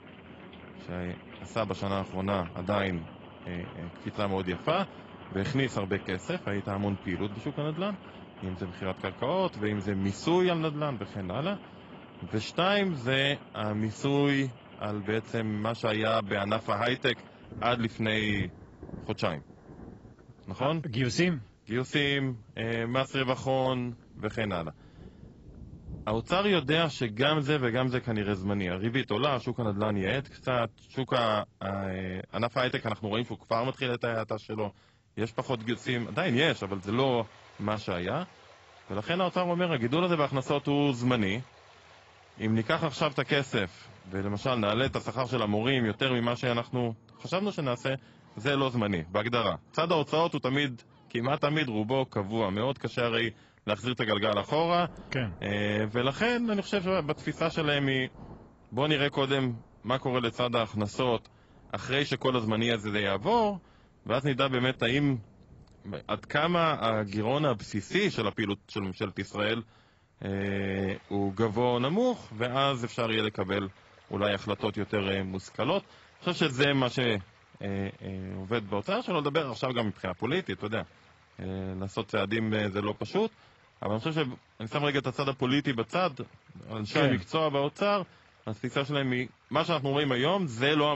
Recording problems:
garbled, watery; badly; nothing above 7.5 kHz
rain or running water; faint; throughout; 20 dB below the speech
abrupt cut into speech; at the end

